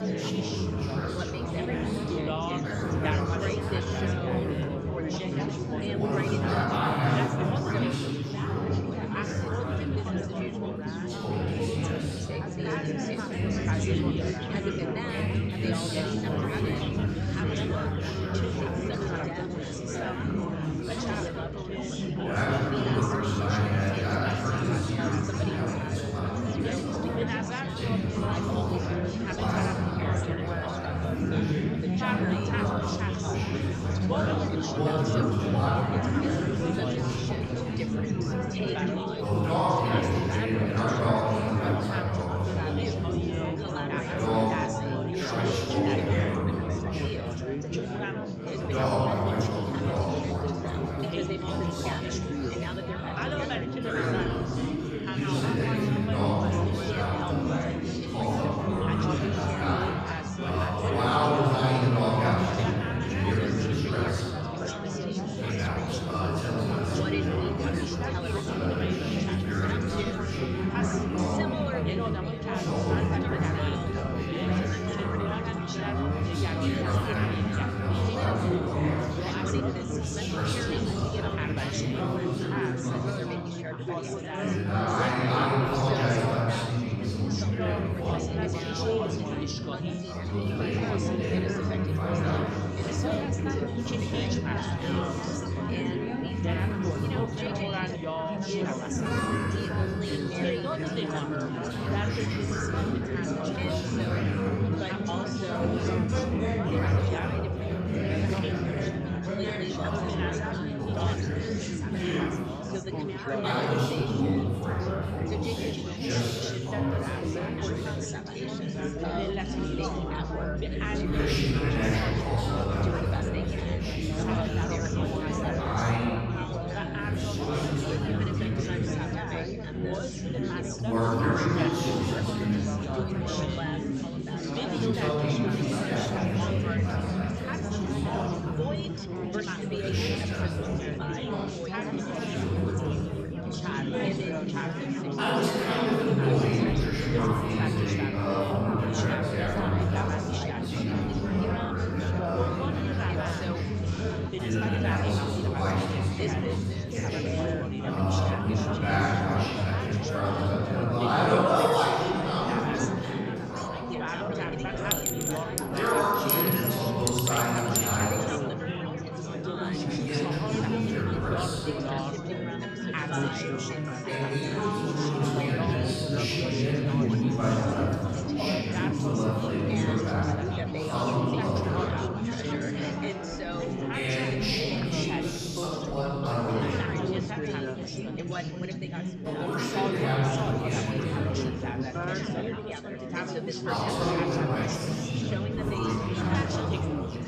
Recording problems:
room echo; strong; dies away in 2.2 s
off-mic speech; far
chatter from many people; loud; throughout; 1 dB below the speech
background music; noticeable; throughout; 15 dB below the speech
clattering dishes; loud; from 2:45 to 2:48; peak 5 dB above the speech

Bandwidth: 14.5 kHz